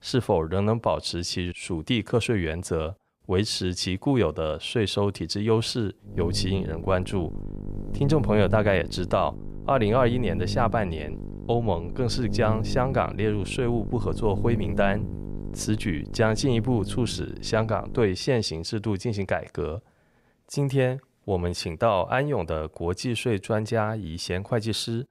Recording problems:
electrical hum; noticeable; from 6 to 18 s; 50 Hz, 15 dB below the speech

